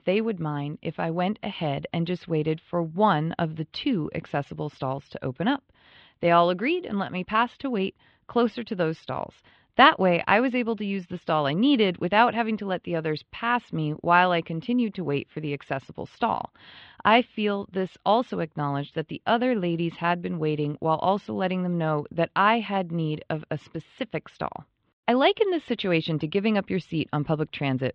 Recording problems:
muffled; very; fading above 3.5 kHz

